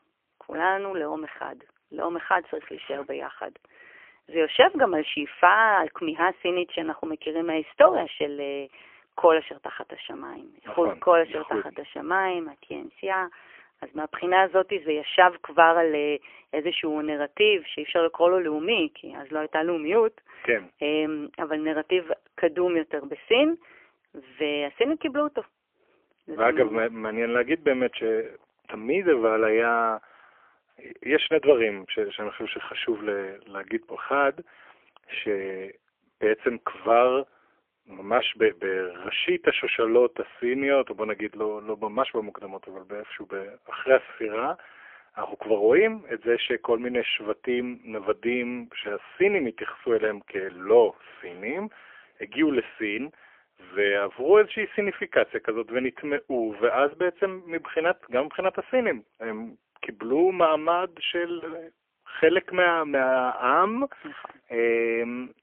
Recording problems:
phone-call audio; poor line; nothing above 3 kHz

